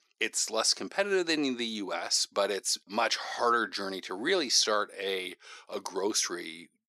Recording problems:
thin; somewhat; fading below 350 Hz

